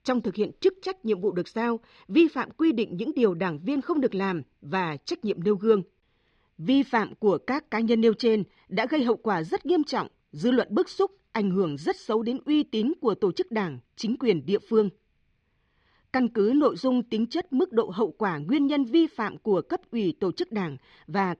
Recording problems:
muffled; slightly; fading above 4 kHz

